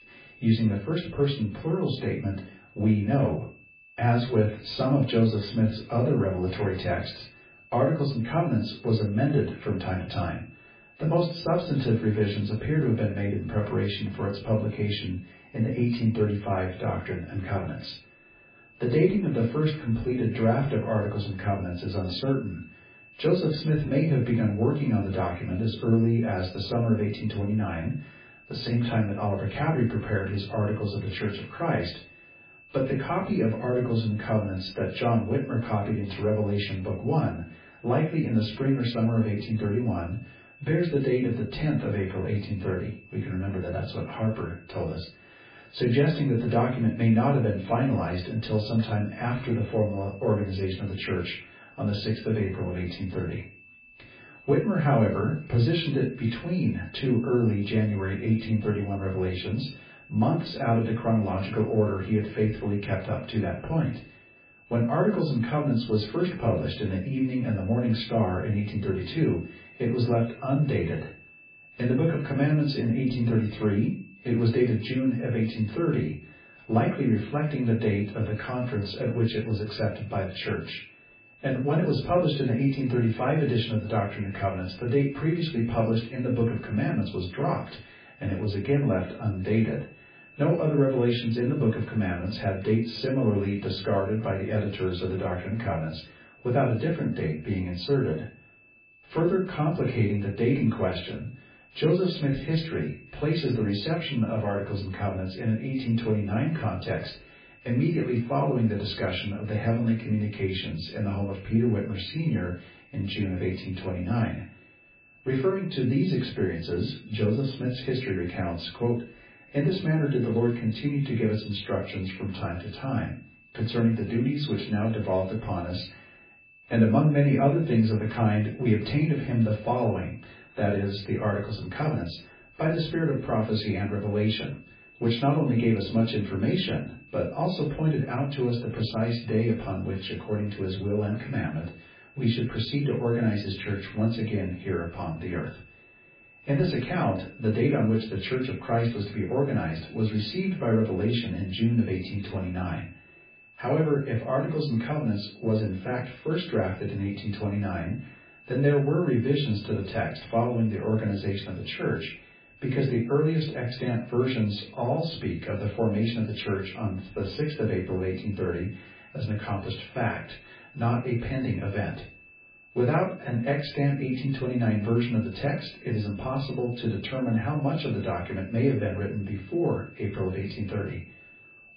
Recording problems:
off-mic speech; far
garbled, watery; badly; nothing above 4.5 kHz
room echo; slight; dies away in 0.3 s
high-pitched whine; faint; throughout; 2.5 kHz, 25 dB below the speech

